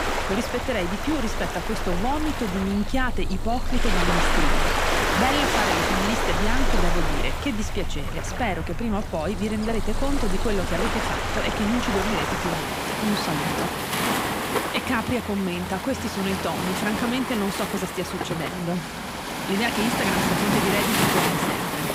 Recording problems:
rain or running water; very loud; throughout; 2 dB above the speech

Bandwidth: 15.5 kHz